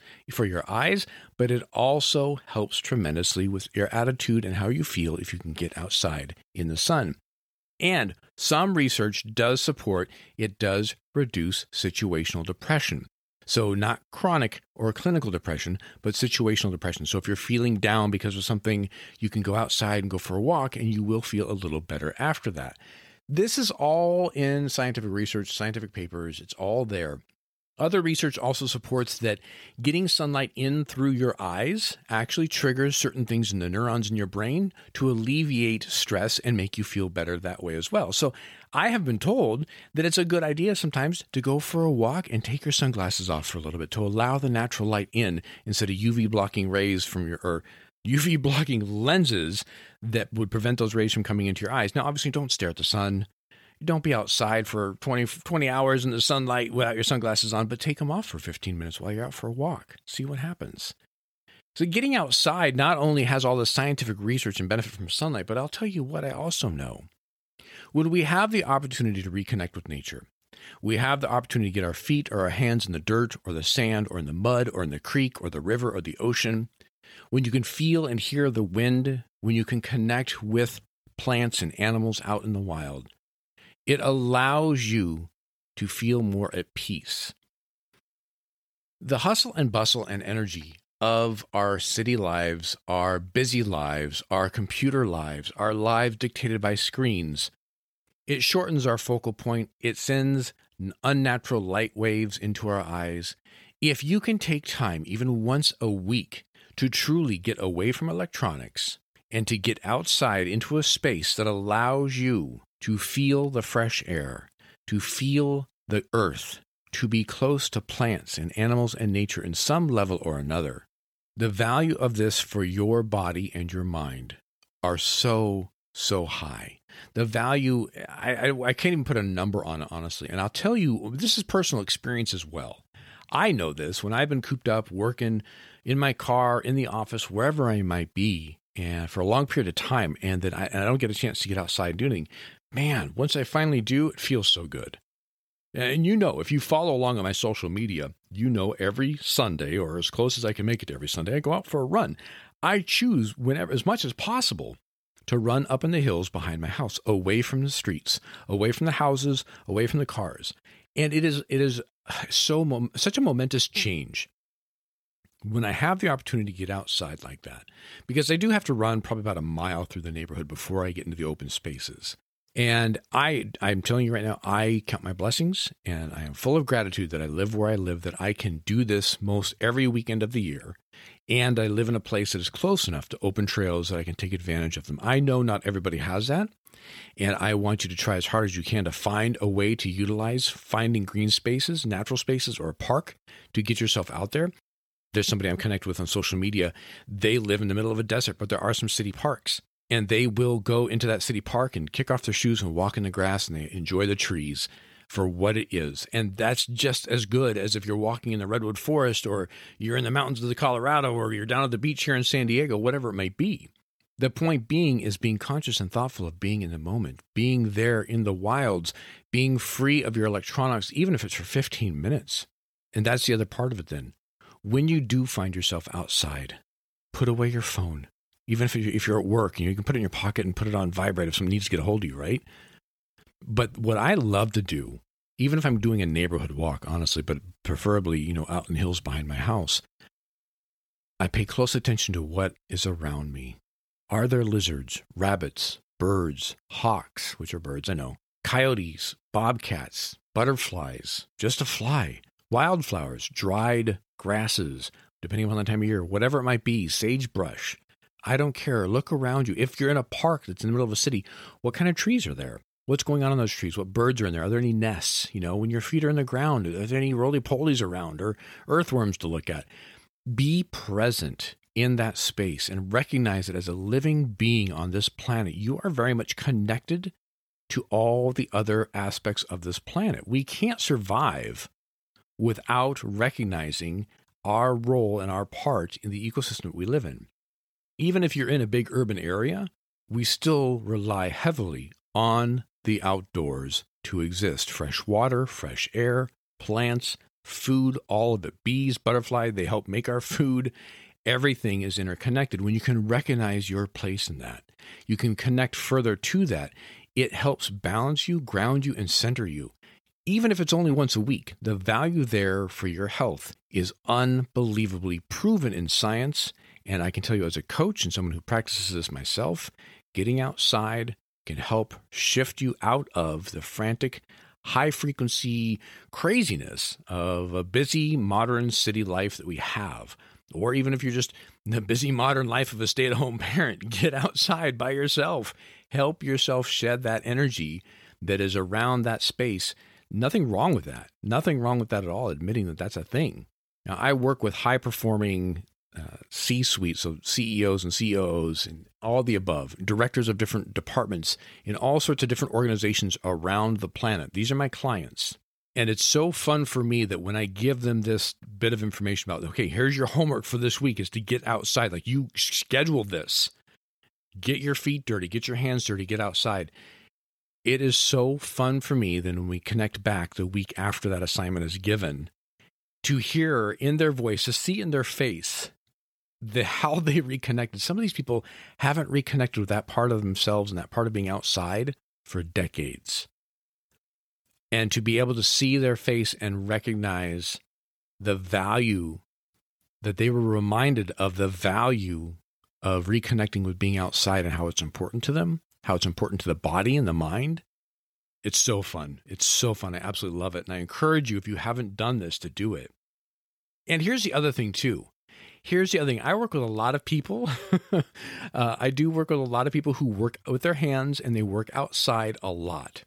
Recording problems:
none

